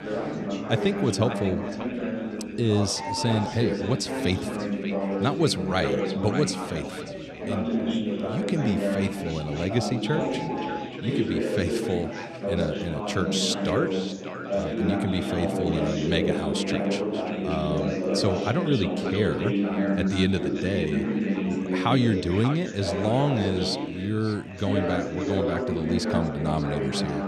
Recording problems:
echo of what is said; noticeable; throughout; 590 ms later, 15 dB below the speech
chatter from many people; loud; throughout; 1 dB below the speech
animal sounds; noticeable; throughout; 15 dB below the speech

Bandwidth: 13.5 kHz